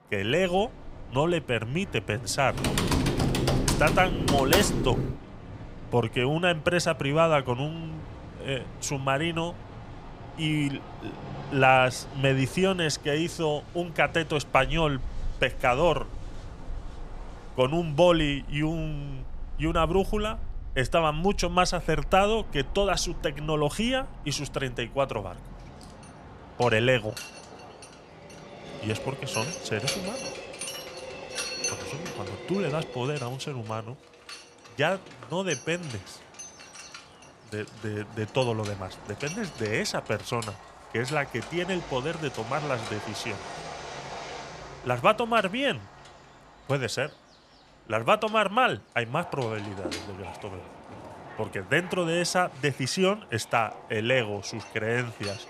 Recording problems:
machinery noise; noticeable; throughout; 15 dB below the speech
train or aircraft noise; noticeable; throughout; 15 dB below the speech
keyboard typing; loud; from 2.5 to 5 s; peak 3 dB above the speech

